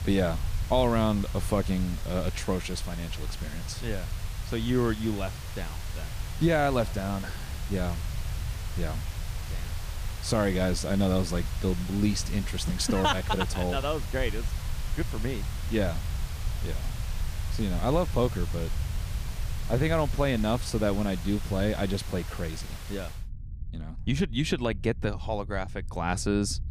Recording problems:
hiss; noticeable; until 23 s; 15 dB below the speech
low rumble; faint; throughout; 25 dB below the speech

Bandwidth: 15 kHz